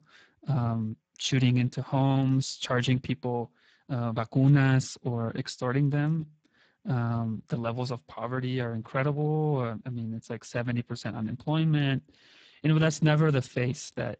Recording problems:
garbled, watery; badly; nothing above 7.5 kHz

